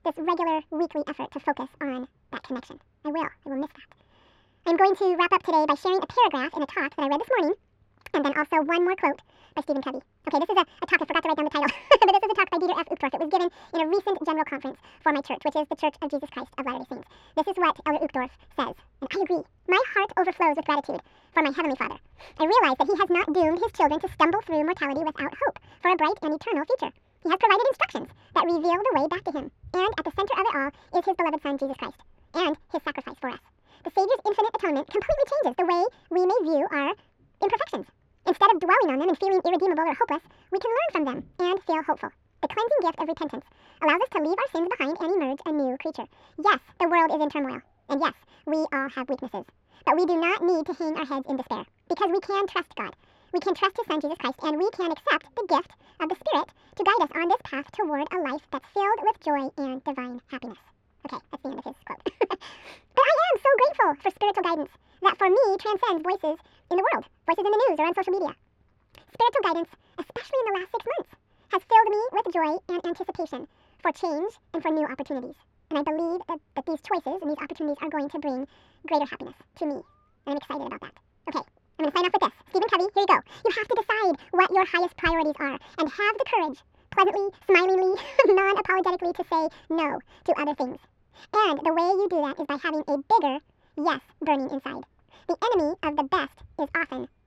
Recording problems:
wrong speed and pitch; too fast and too high; 1.7 times normal speed
muffled; slightly; fading above 2.5 kHz

